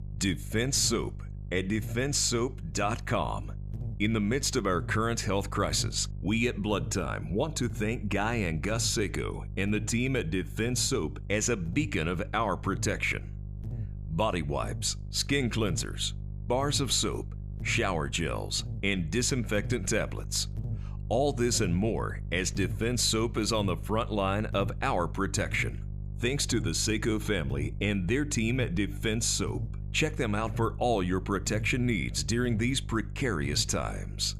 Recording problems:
electrical hum; faint; throughout; 50 Hz, 20 dB below the speech

